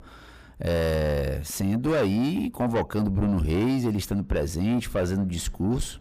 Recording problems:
distortion; heavy; 7 dB below the speech

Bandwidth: 15 kHz